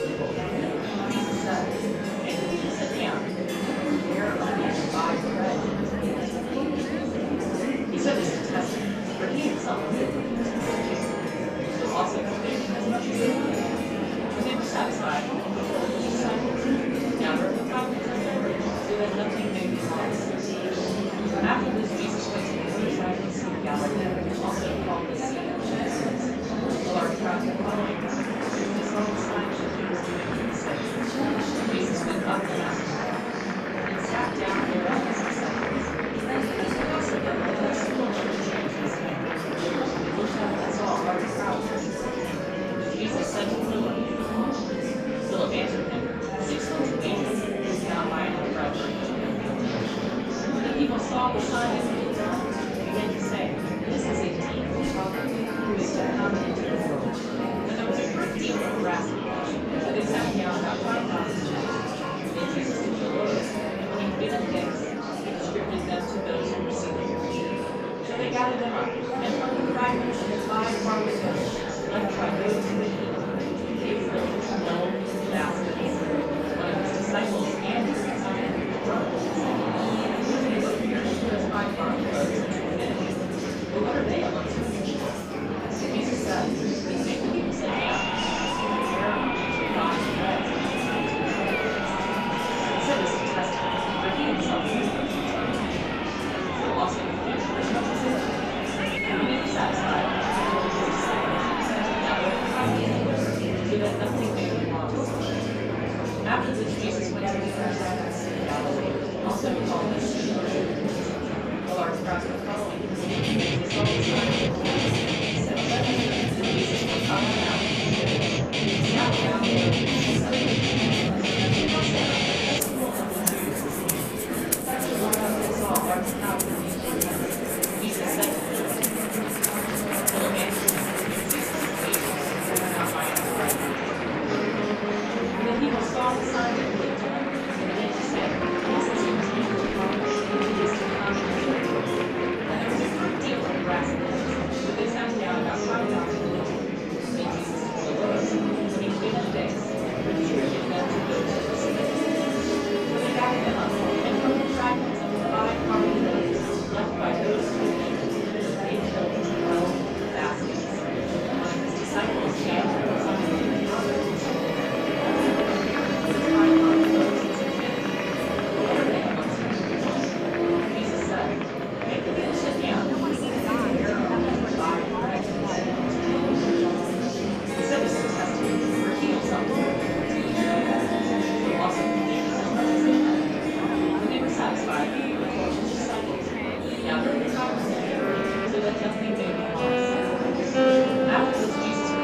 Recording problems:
room echo; strong; dies away in 2.9 s
off-mic speech; far
background music; very loud; throughout; 2 dB above the speech
murmuring crowd; very loud; throughout; 5 dB above the speech

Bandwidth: 14.5 kHz